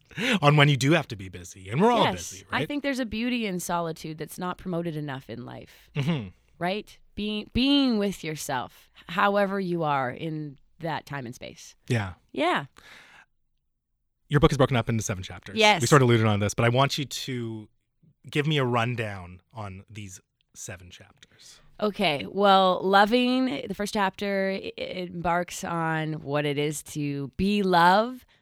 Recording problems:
uneven, jittery; strongly; from 1.5 to 27 s

